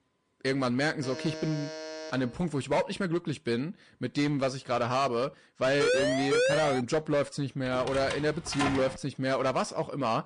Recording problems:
distortion; slight; 9% of the sound clipped
garbled, watery; slightly
alarm; noticeable; from 1 to 2.5 s; peak 9 dB below the speech
siren; loud; from 6 to 7 s; peak 4 dB above the speech
door banging; noticeable; from 7.5 to 9 s; peak 1 dB below the speech

